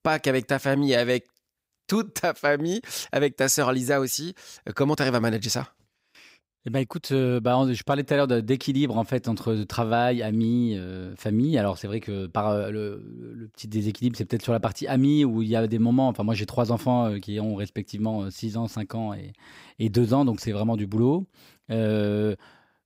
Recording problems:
none

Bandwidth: 15.5 kHz